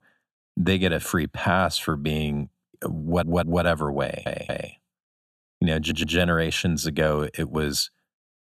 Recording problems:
audio stuttering; at 3 s, at 4 s and at 6 s

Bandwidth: 13.5 kHz